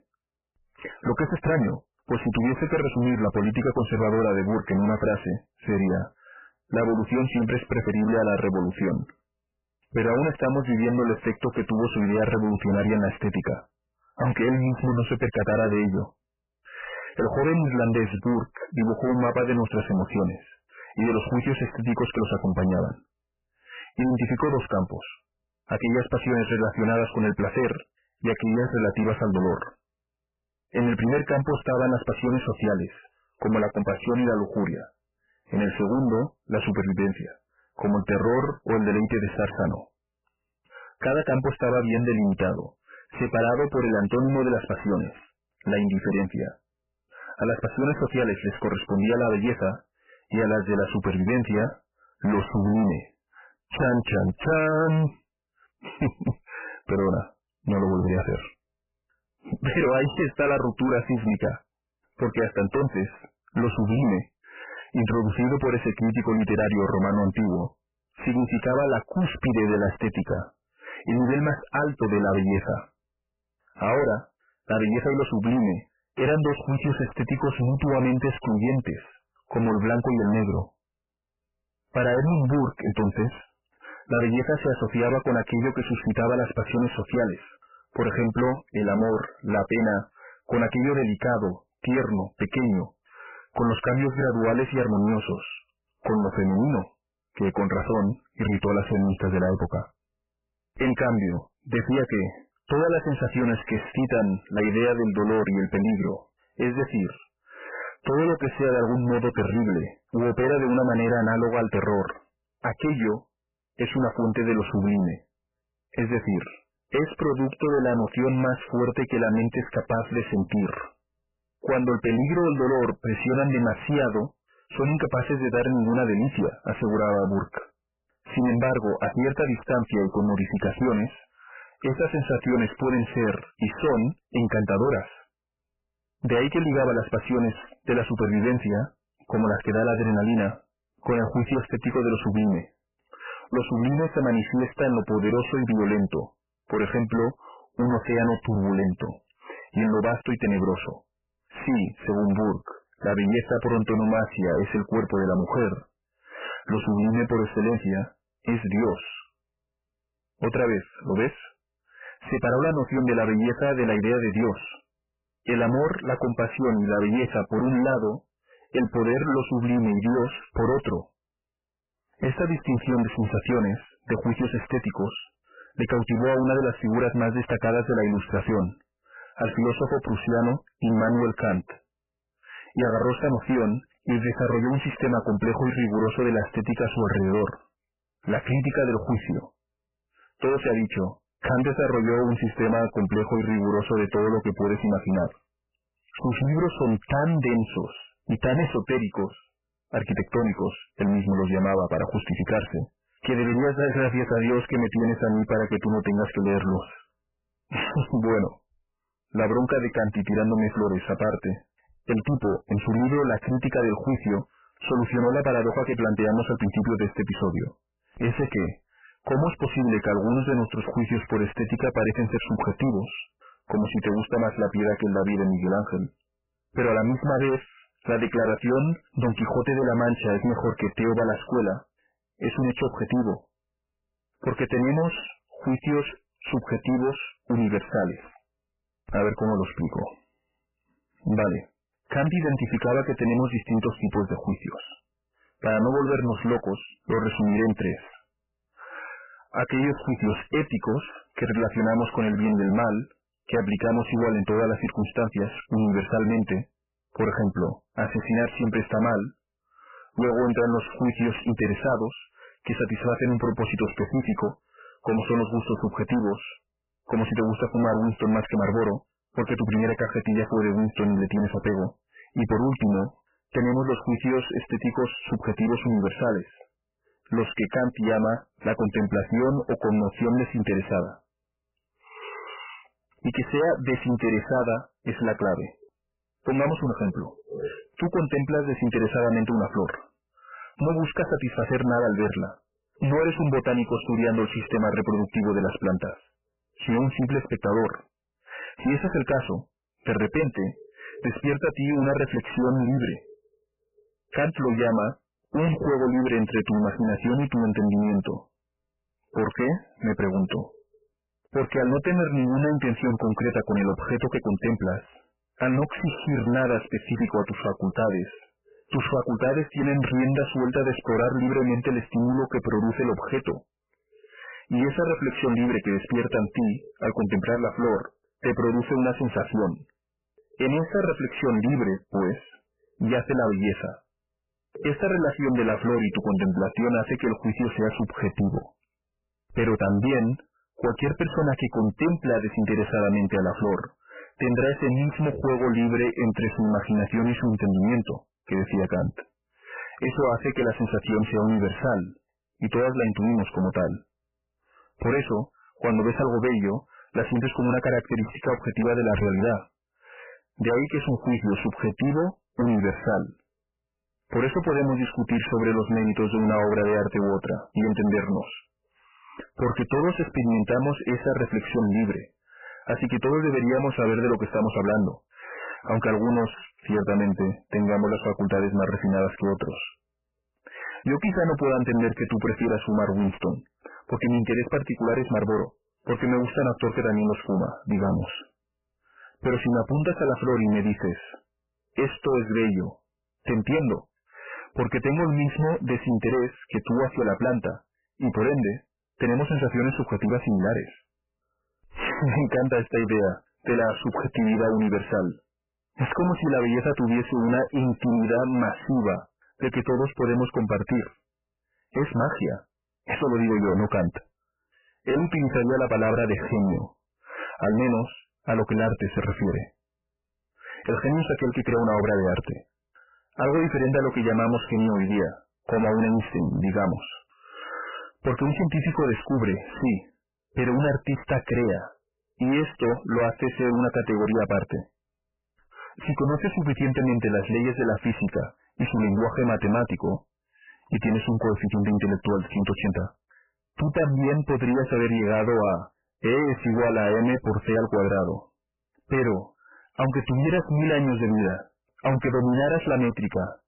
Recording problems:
distortion; heavy; 21% of the sound clipped
garbled, watery; badly; nothing above 3 kHz

